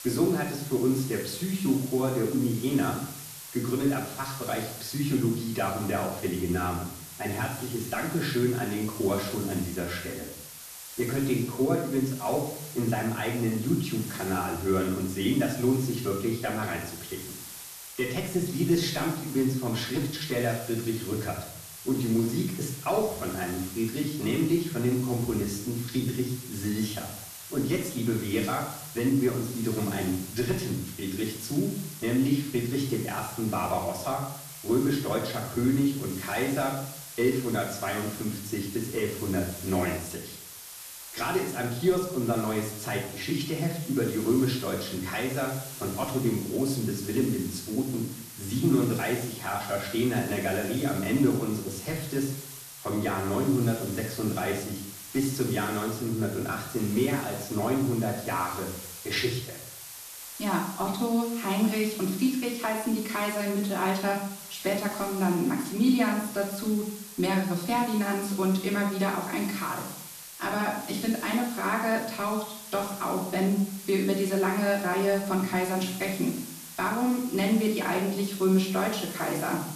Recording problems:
off-mic speech; far
room echo; noticeable; dies away in 0.6 s
hiss; noticeable; throughout; 10 dB below the speech

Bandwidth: 14 kHz